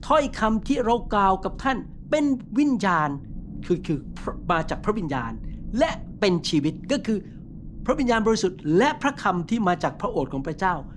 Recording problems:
low rumble; faint; throughout; 25 dB below the speech

